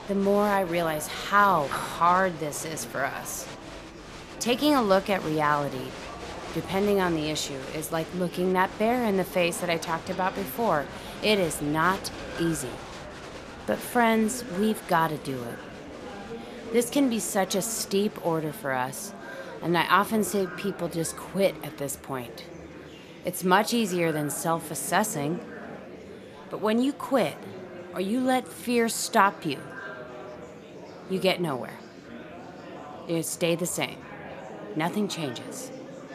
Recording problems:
echo of what is said; faint; from 10 s on; 170 ms later, 25 dB below the speech
murmuring crowd; noticeable; throughout; 15 dB below the speech

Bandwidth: 14.5 kHz